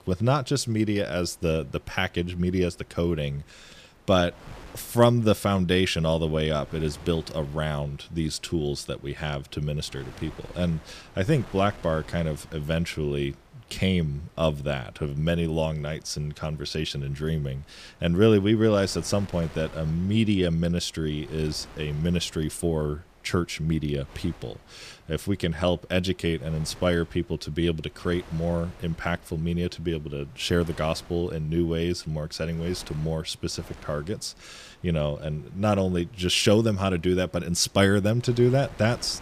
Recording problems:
wind noise on the microphone; occasional gusts; 20 dB below the speech

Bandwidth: 15 kHz